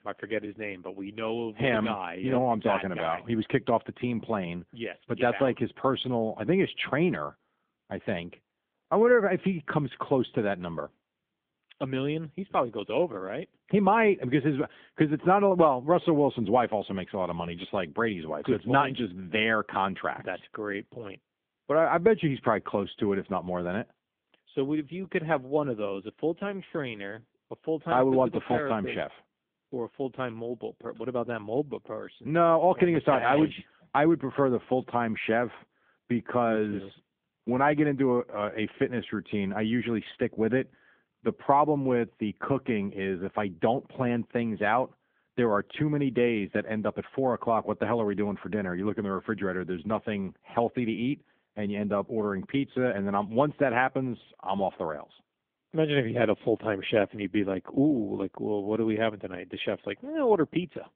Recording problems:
phone-call audio; nothing above 3.5 kHz

